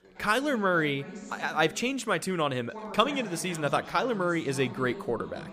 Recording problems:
background chatter; noticeable; throughout; 2 voices, 15 dB below the speech

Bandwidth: 15 kHz